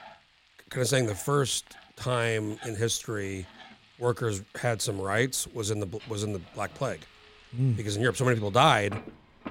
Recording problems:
household noises; faint; throughout; 20 dB below the speech

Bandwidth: 16 kHz